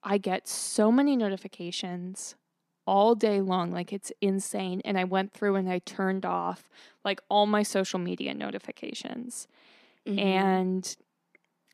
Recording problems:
none

